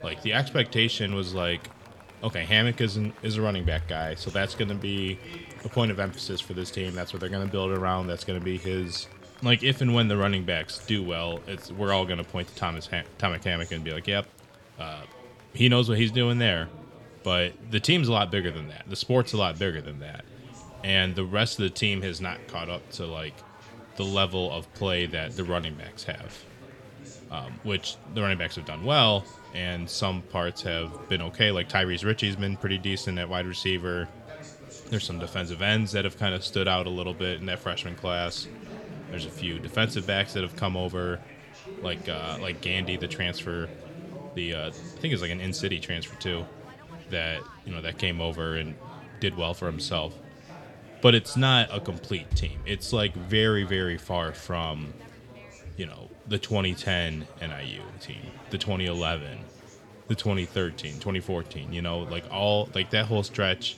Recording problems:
chatter from many people; noticeable; throughout; 20 dB below the speech

